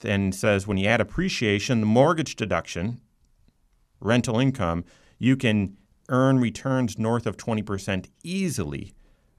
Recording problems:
none

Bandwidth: 14 kHz